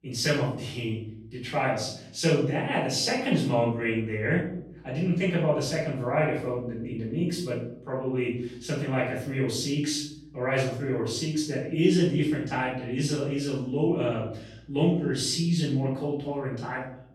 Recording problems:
off-mic speech; far
room echo; noticeable; dies away in 0.6 s

